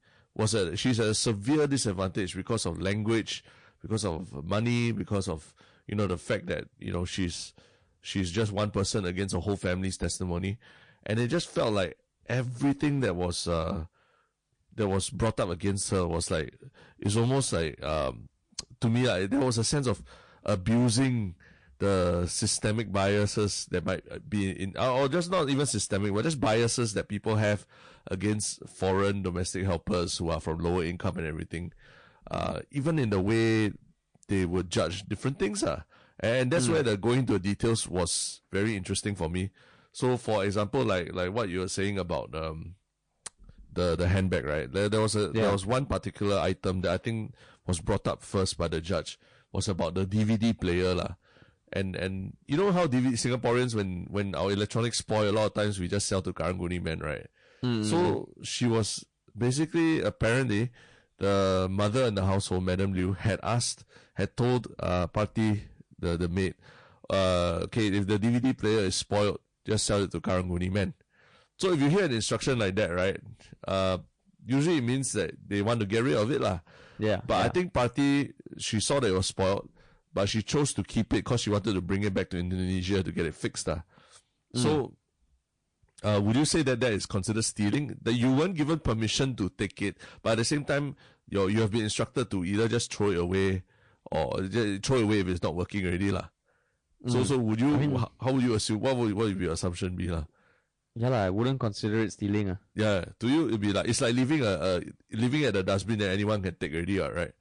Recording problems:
distortion; slight; 6% of the sound clipped
garbled, watery; slightly

